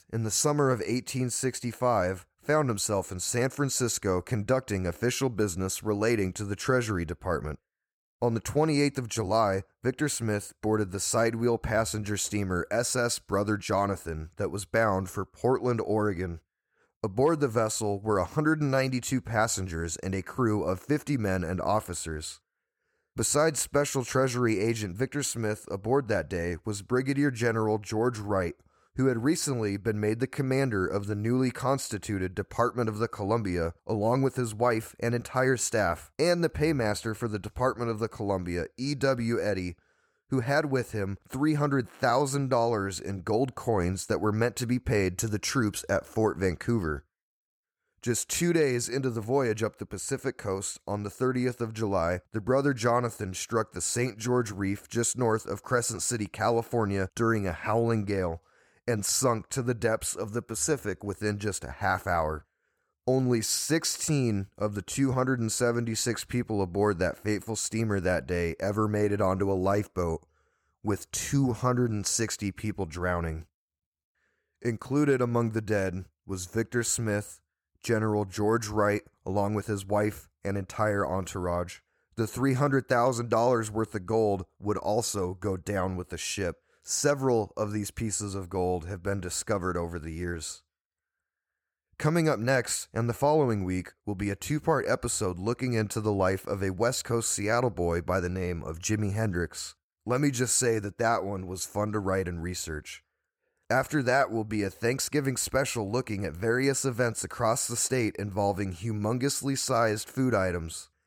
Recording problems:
none

